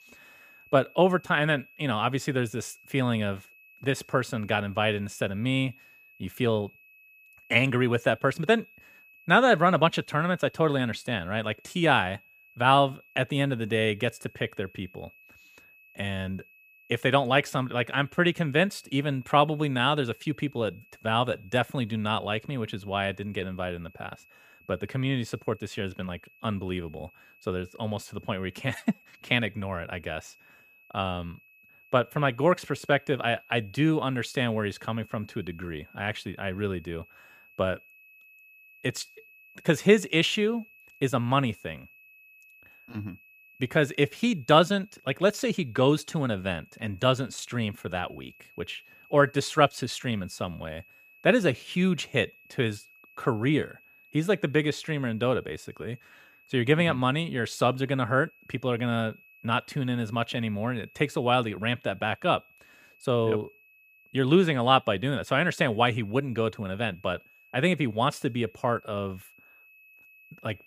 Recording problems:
high-pitched whine; faint; throughout; 2.5 kHz, 25 dB below the speech

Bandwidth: 15 kHz